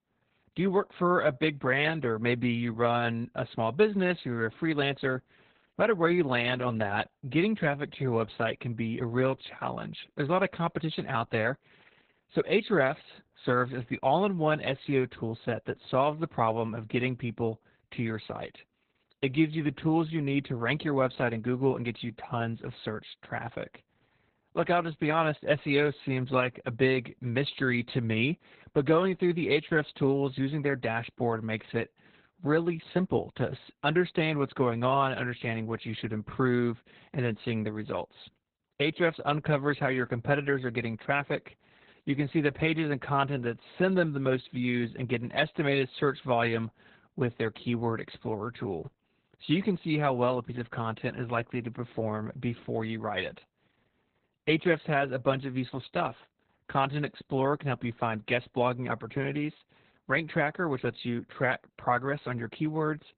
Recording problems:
garbled, watery; badly; nothing above 4 kHz

